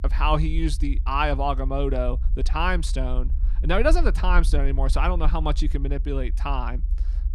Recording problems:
low rumble; faint; throughout; 20 dB below the speech

